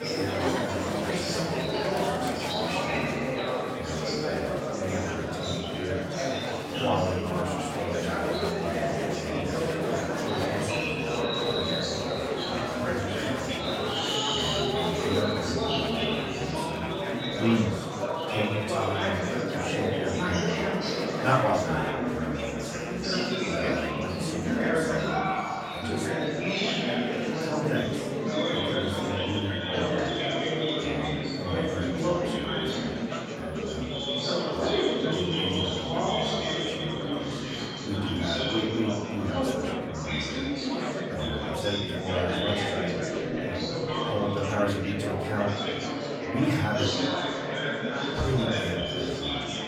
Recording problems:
off-mic speech; far
room echo; noticeable; dies away in 0.6 s
murmuring crowd; very loud; throughout; 5 dB above the speech

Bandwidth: 16.5 kHz